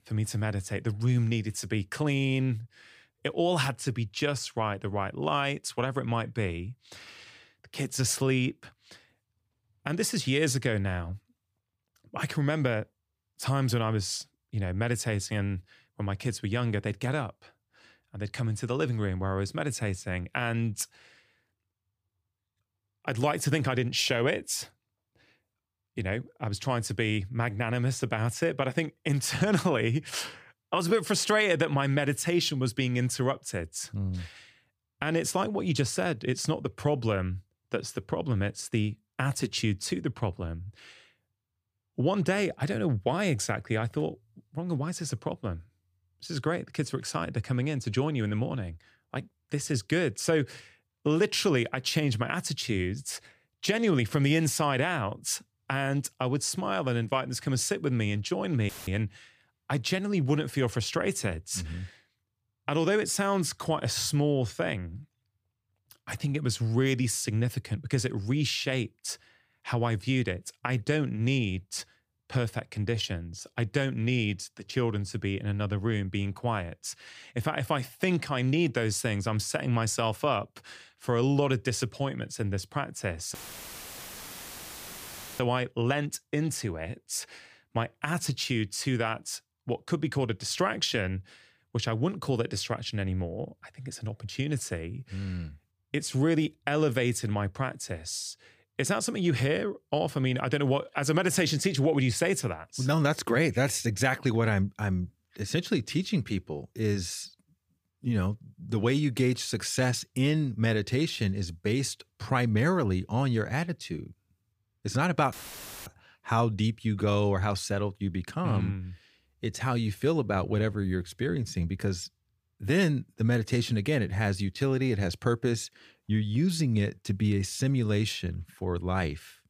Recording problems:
audio cutting out; filled with static; at 59 s, at 1:23 for 2 s and at 1:55 for 0.5 s

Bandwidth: 15 kHz